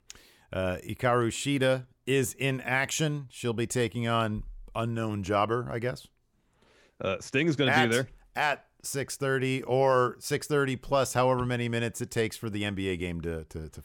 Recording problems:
none

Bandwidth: 17.5 kHz